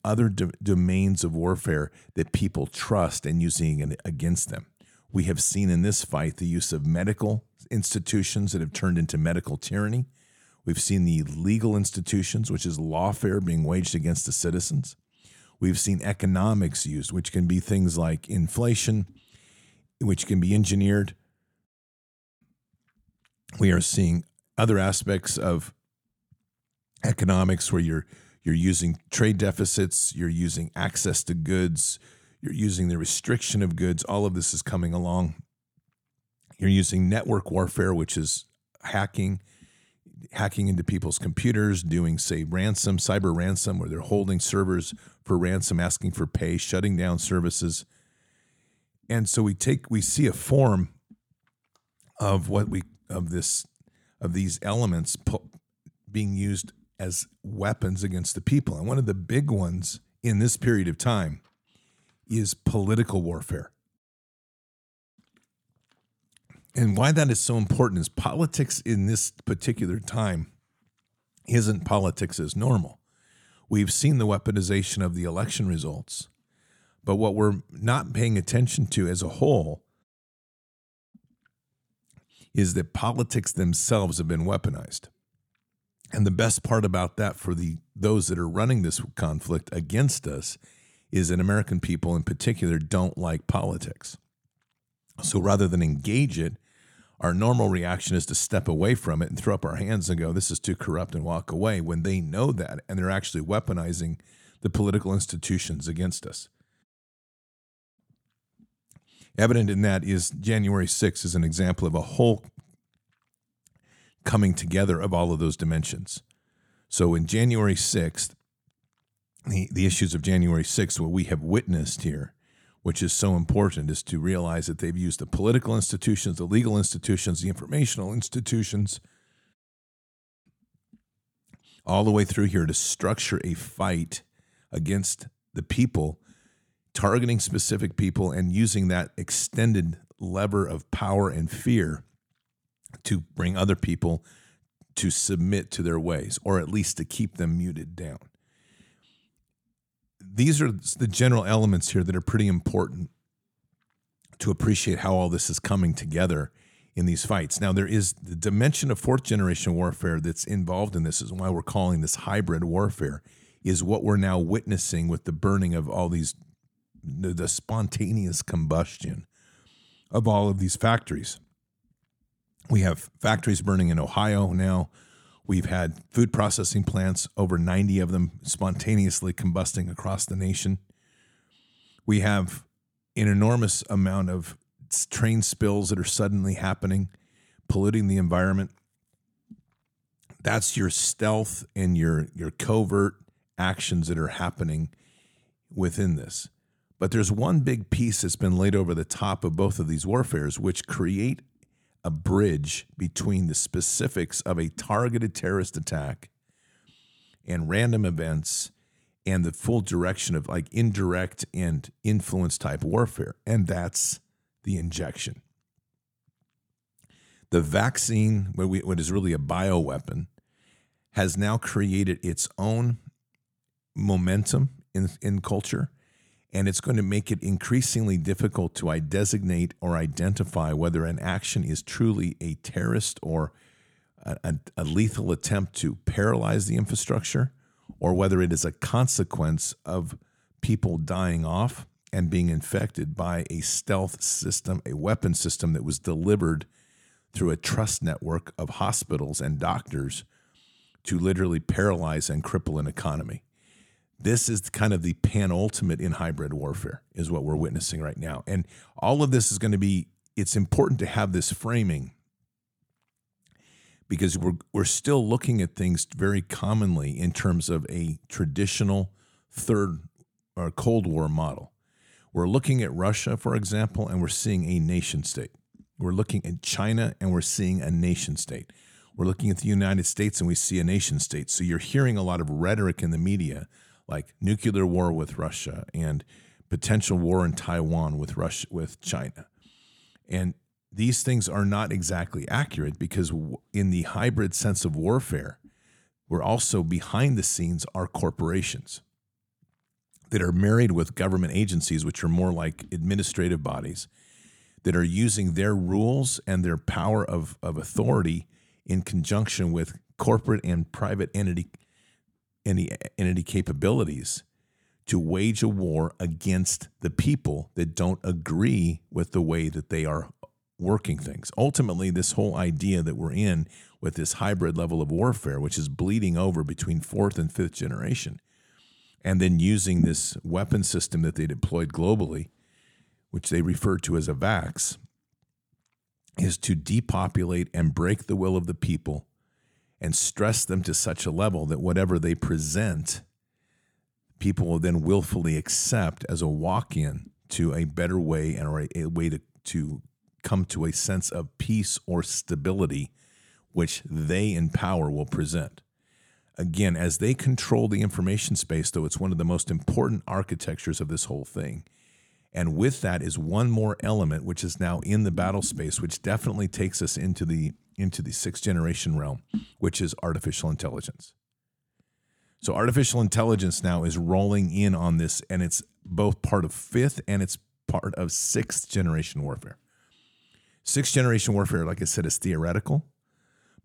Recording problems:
none

